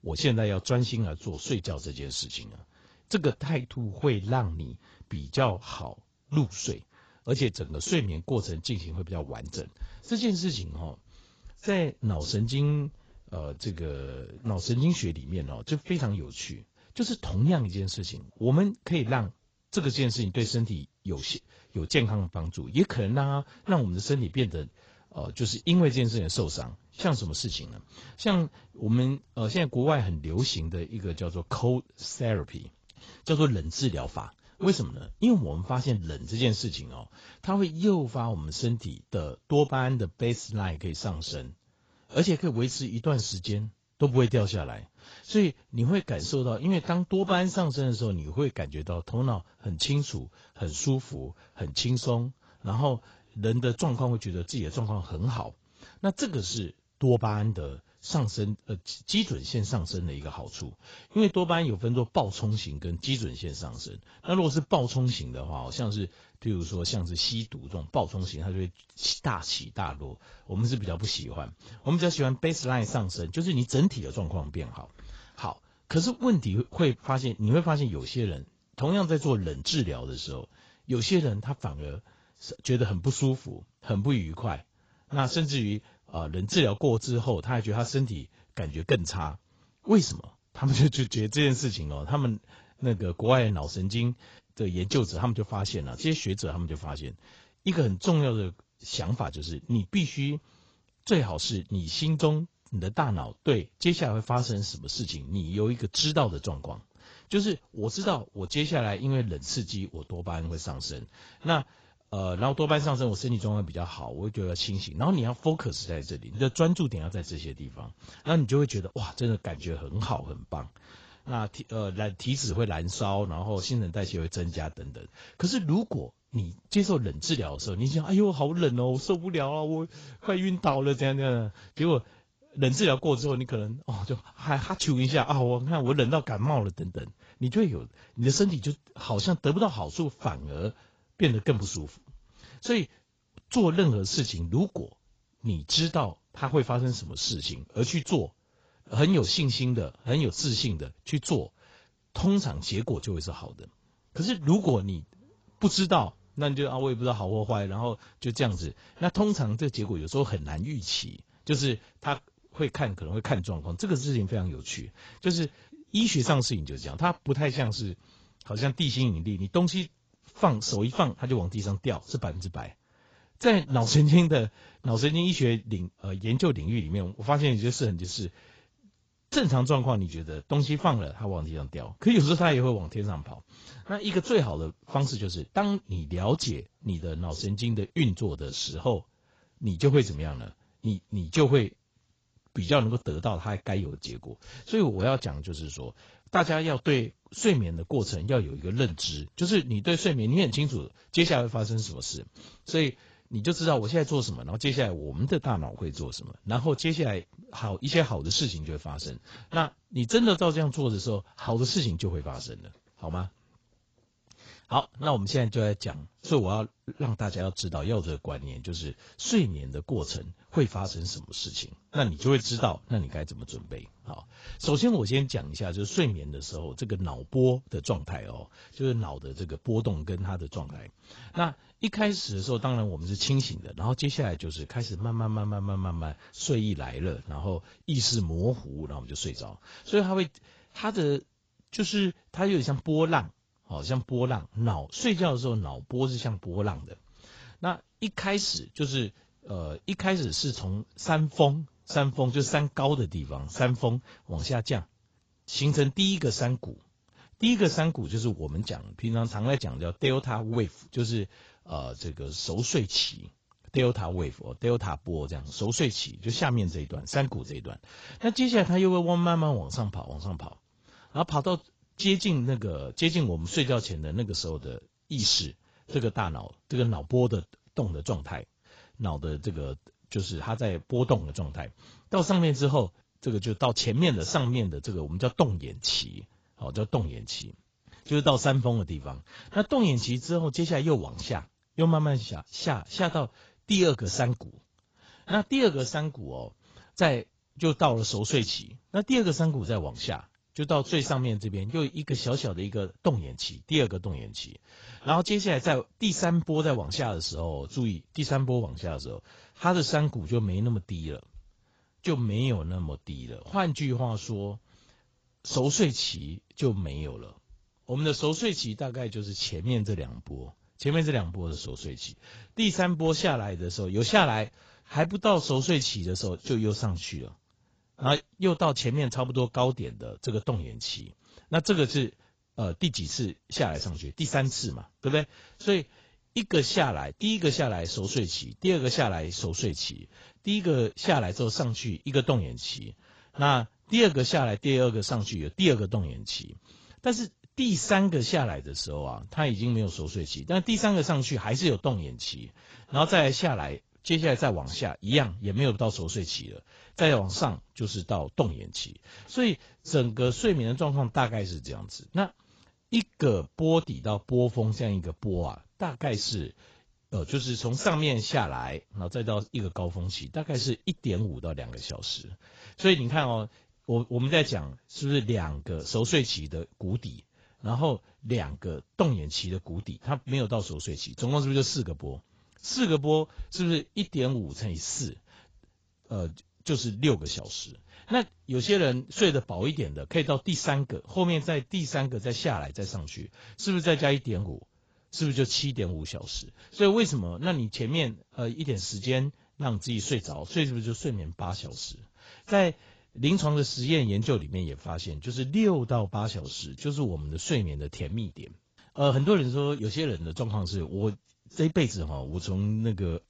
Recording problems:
garbled, watery; badly; nothing above 7.5 kHz

